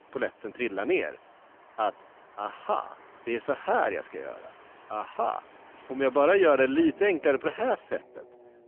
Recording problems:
phone-call audio; poor line; nothing above 3 kHz
traffic noise; faint; throughout; 25 dB below the speech

